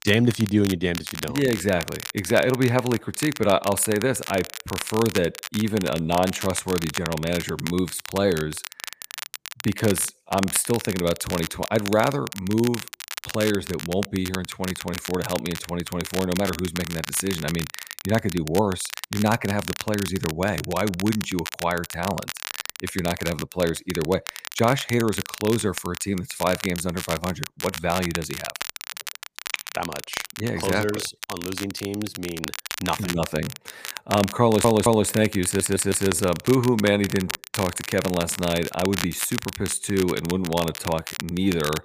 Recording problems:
crackle, like an old record; loud; 9 dB below the speech
audio stuttering; at 34 s and at 35 s

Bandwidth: 15 kHz